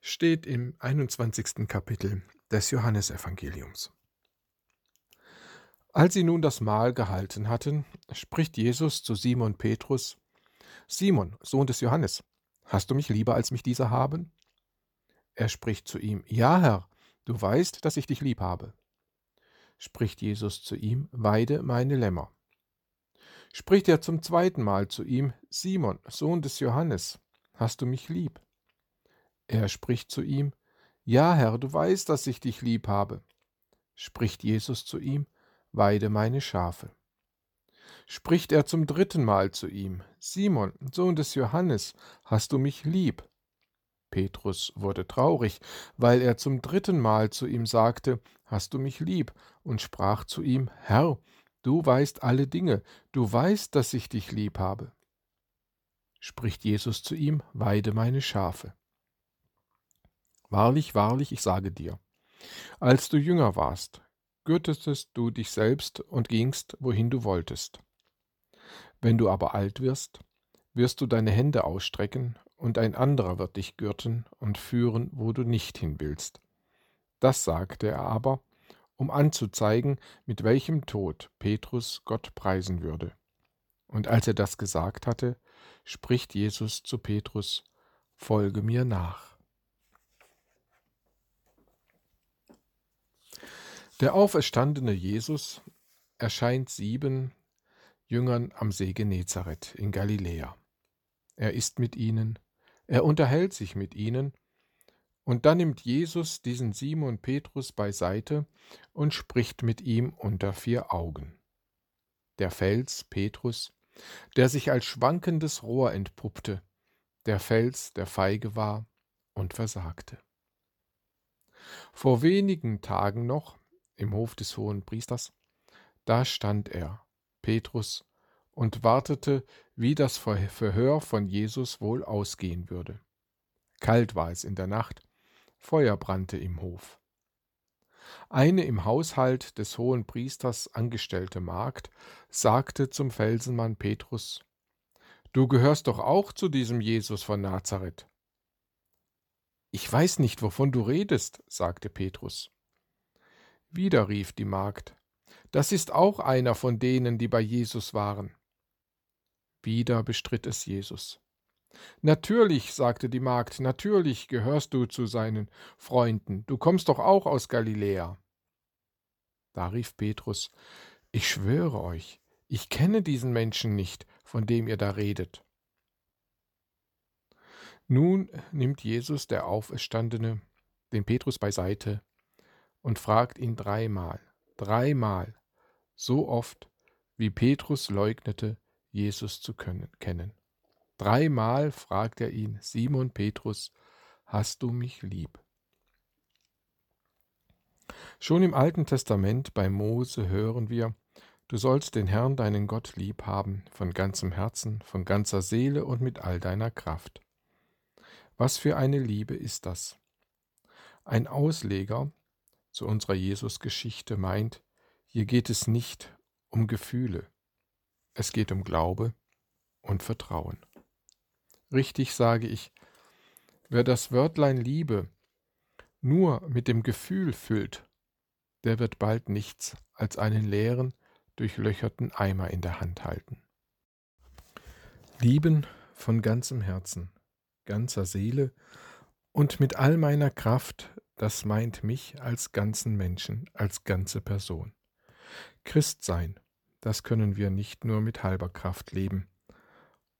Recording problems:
uneven, jittery; strongly; from 11 s to 3:21

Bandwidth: 18.5 kHz